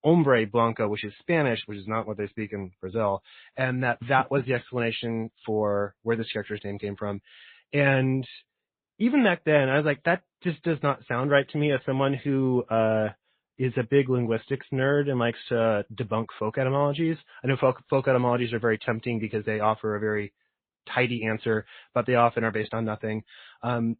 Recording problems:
high frequencies cut off; severe; nothing above 4 kHz
garbled, watery; slightly

